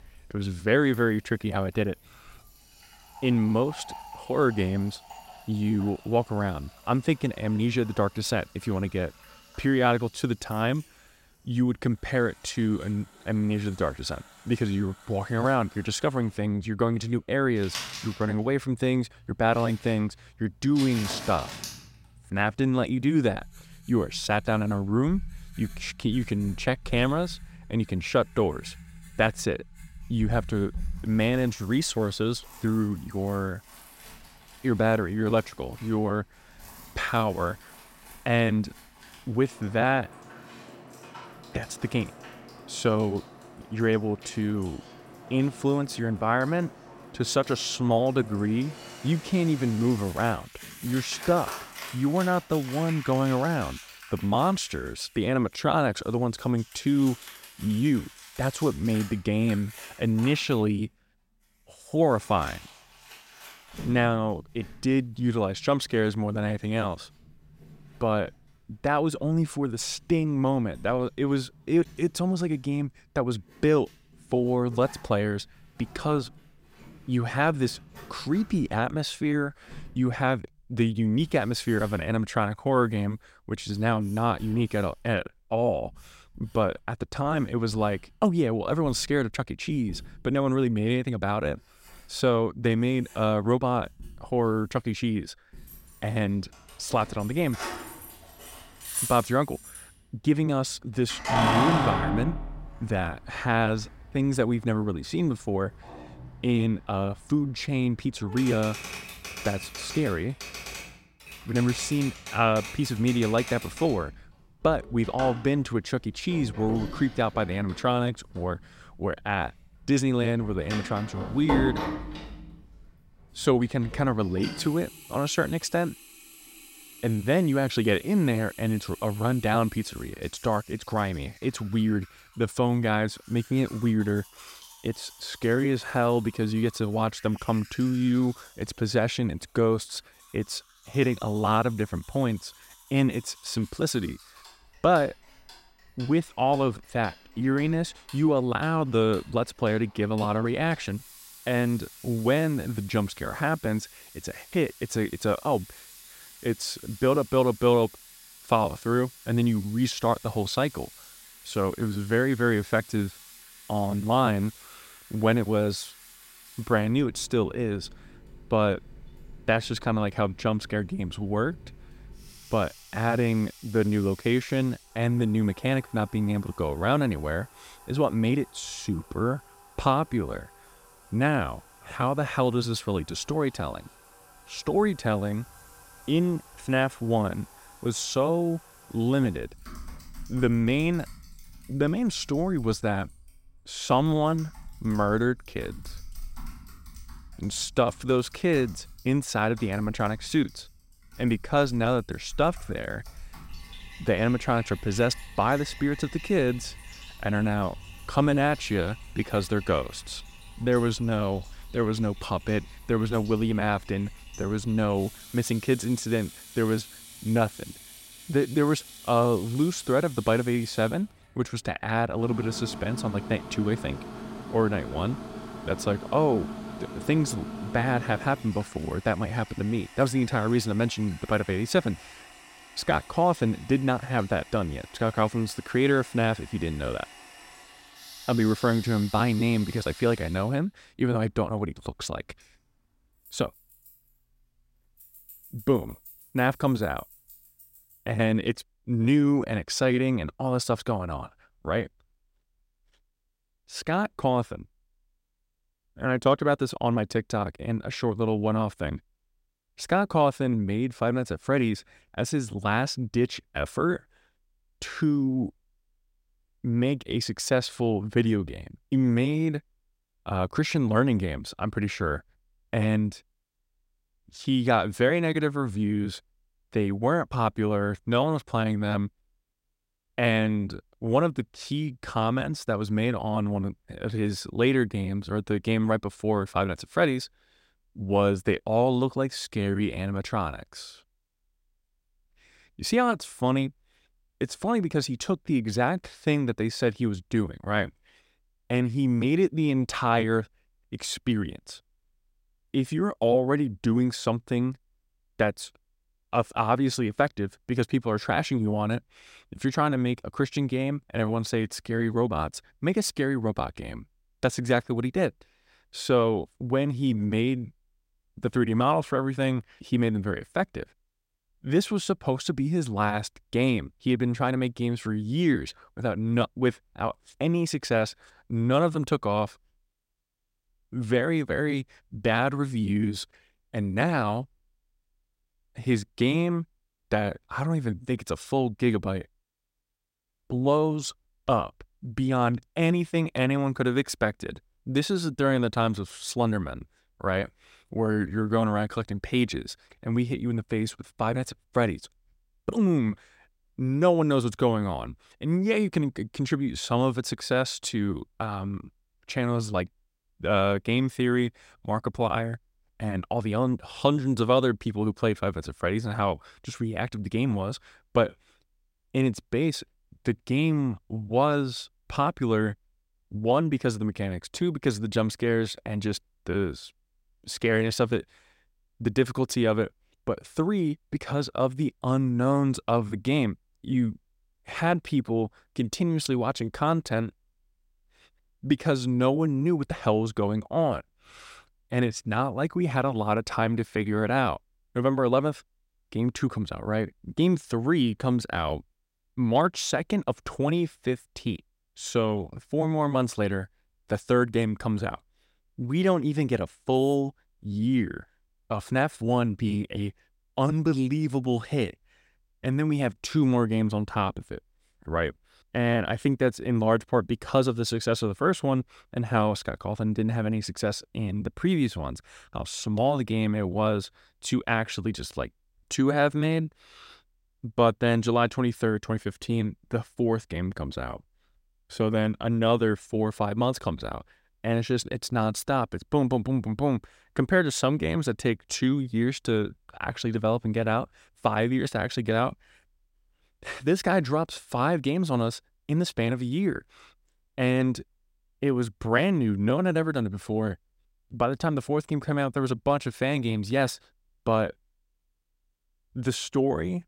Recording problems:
household noises; noticeable; until 4:08; 15 dB below the speech

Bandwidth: 16 kHz